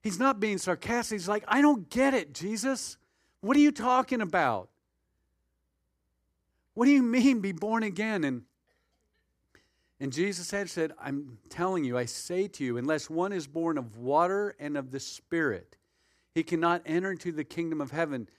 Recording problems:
none

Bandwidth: 14.5 kHz